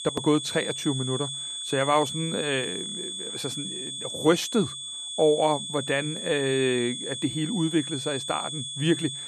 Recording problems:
high-pitched whine; loud; throughout; 3.5 kHz, 5 dB below the speech

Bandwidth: 14 kHz